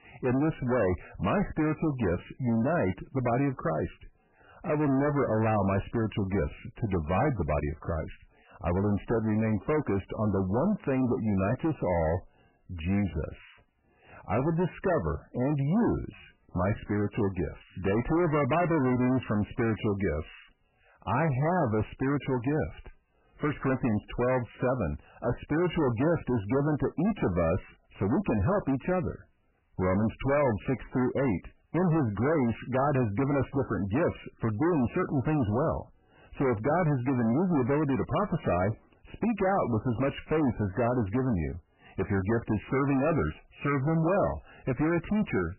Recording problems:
distortion; heavy; 6 dB below the speech
garbled, watery; badly; nothing above 3 kHz

